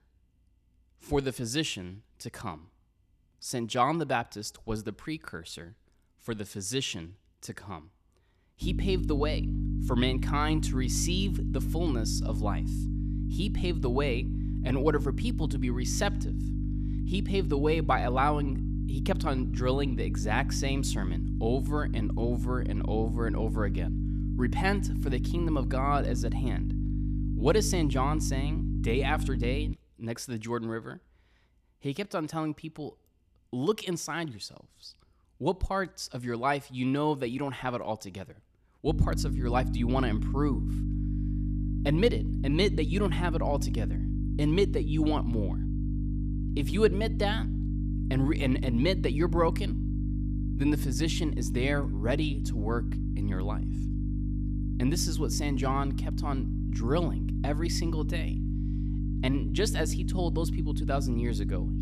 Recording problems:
electrical hum; loud; from 8.5 to 30 s and from 39 s on; 50 Hz, 9 dB below the speech

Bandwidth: 14 kHz